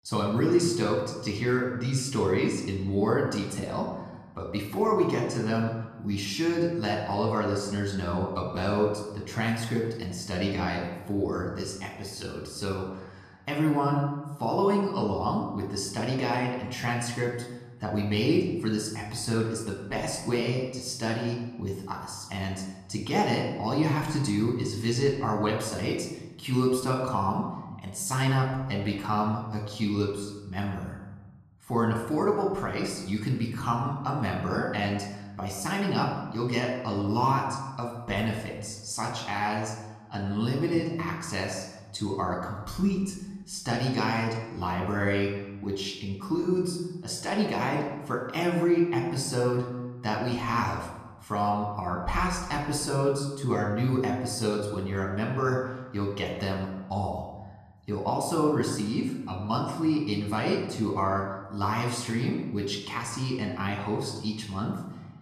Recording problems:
room echo; noticeable; dies away in 1 s
off-mic speech; somewhat distant

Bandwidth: 14 kHz